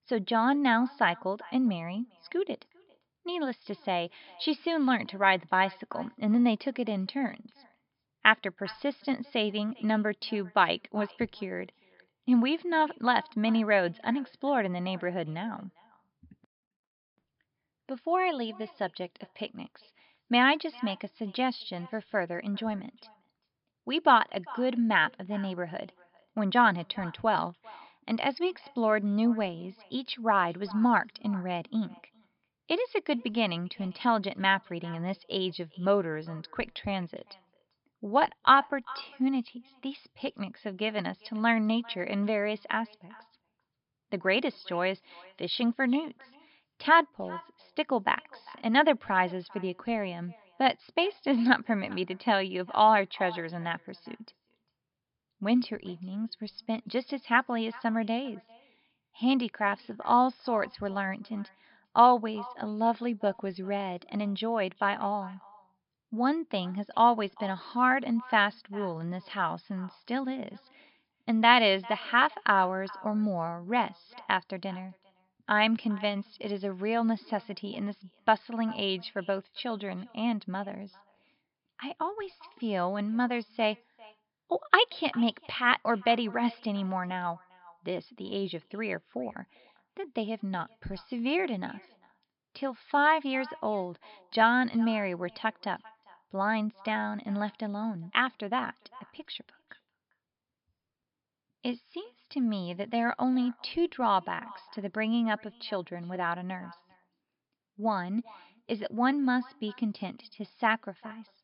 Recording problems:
high frequencies cut off; noticeable; nothing above 5.5 kHz
echo of what is said; faint; throughout; 400 ms later, 25 dB below the speech

